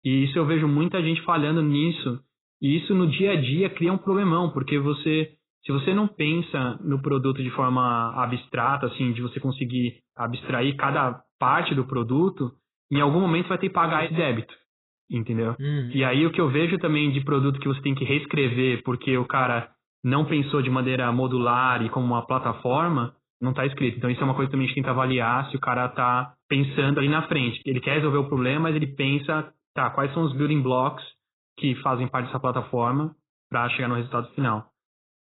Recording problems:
garbled, watery; badly; nothing above 4 kHz

